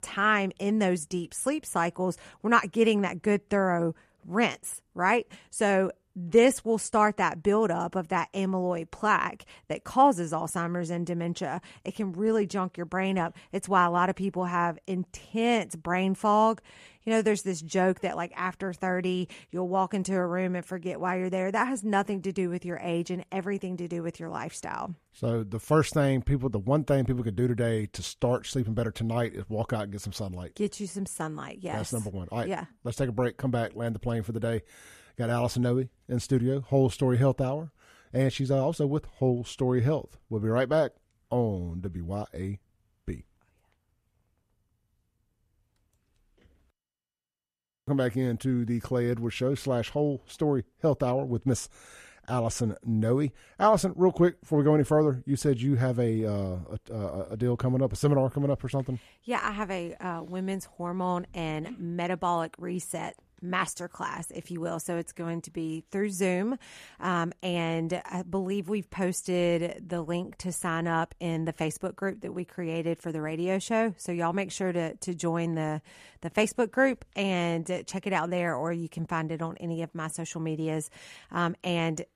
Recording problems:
none

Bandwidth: 14.5 kHz